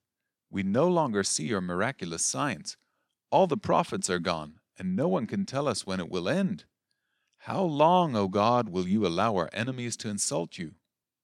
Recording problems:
none

